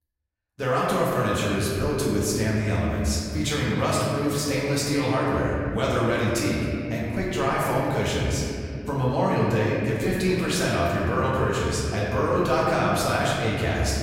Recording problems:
off-mic speech; far
room echo; noticeable; dies away in 2.8 s

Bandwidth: 16 kHz